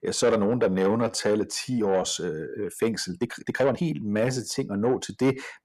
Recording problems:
distortion; slight; 10 dB below the speech
uneven, jittery; strongly; from 0.5 to 4.5 s

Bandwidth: 14 kHz